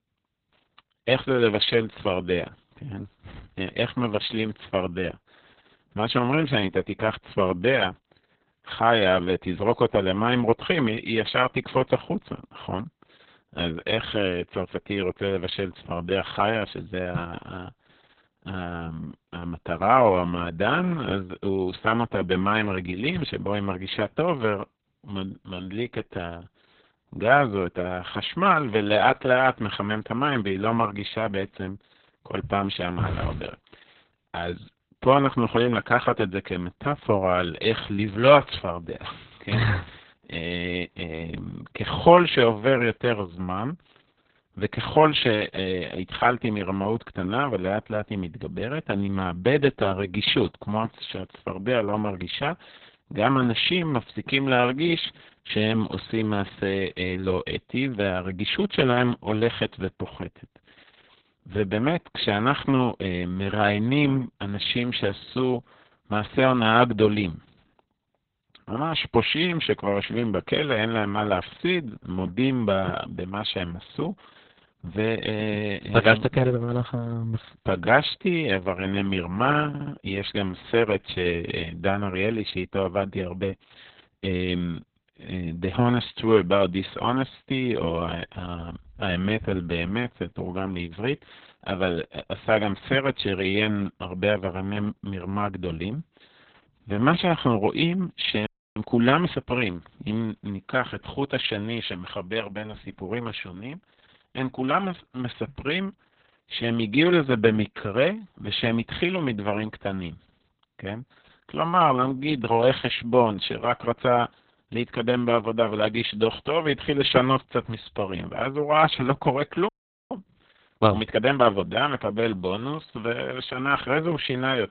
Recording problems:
garbled, watery; badly; nothing above 4 kHz
audio stuttering; at 1:20
audio freezing; at 1:38 and at 2:00

